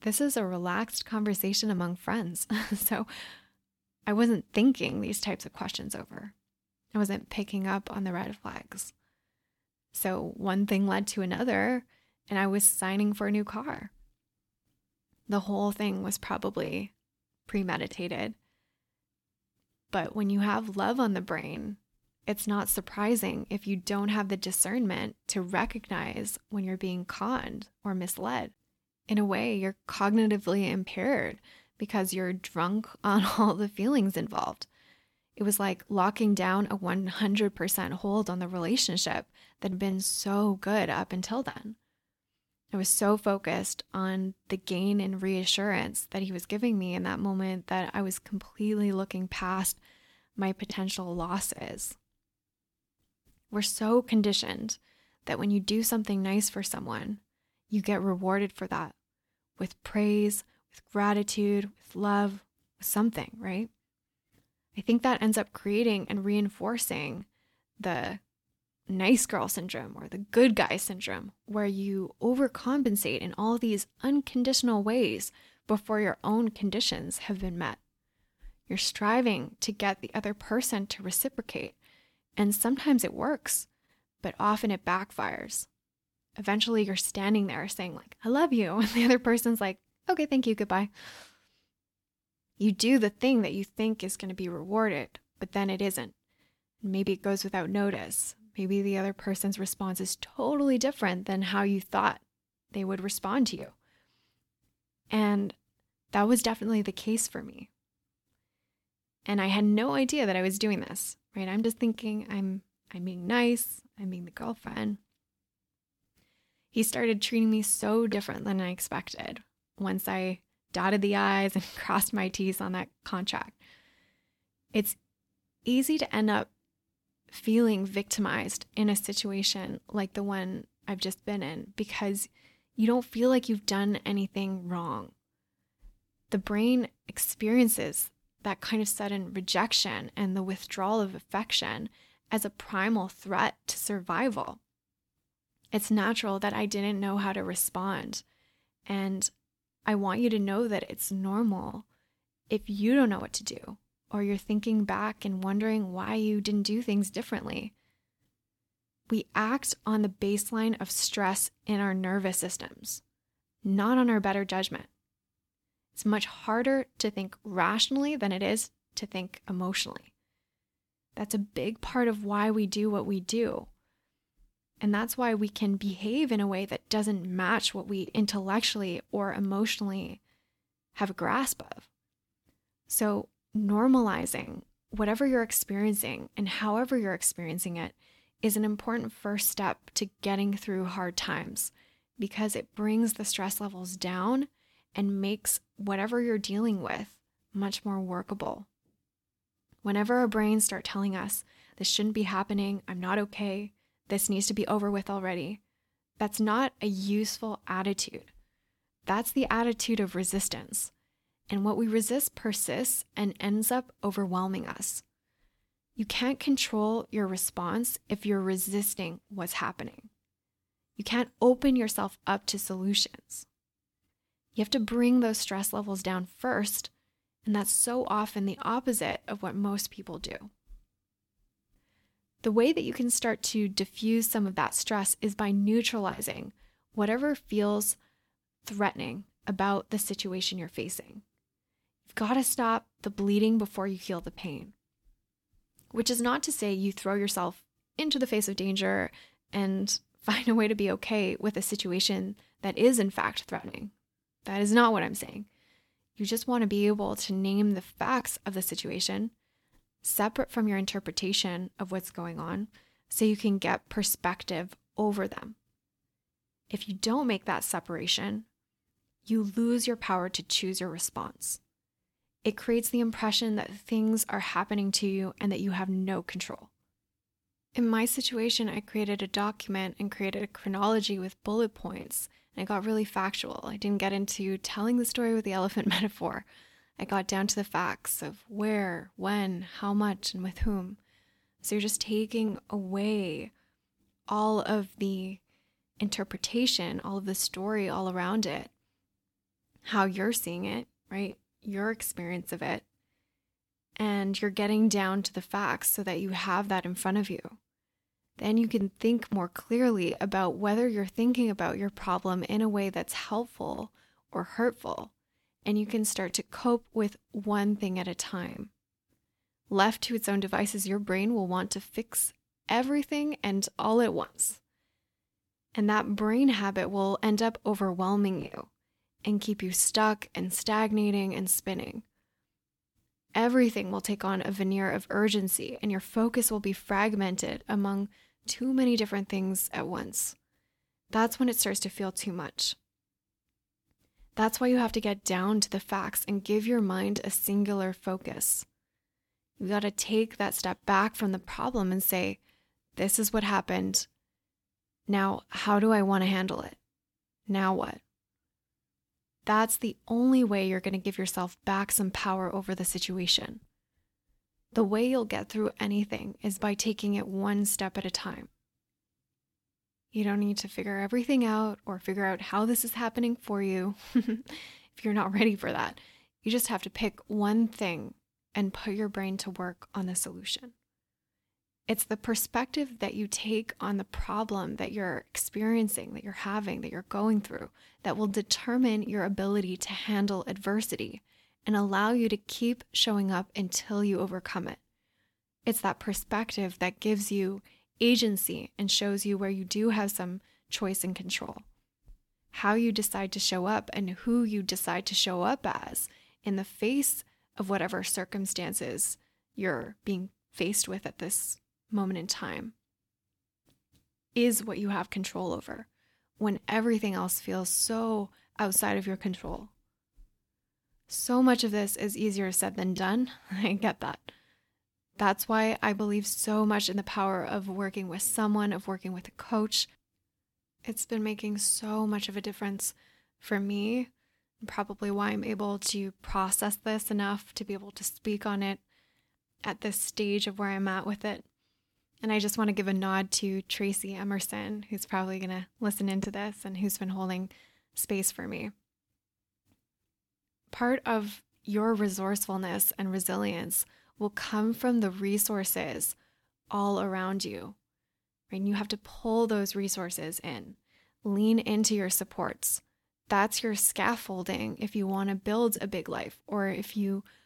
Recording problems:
none

